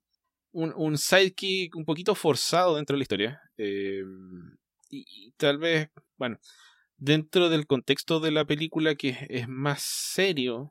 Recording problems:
uneven, jittery; strongly; from 1.5 to 10 s

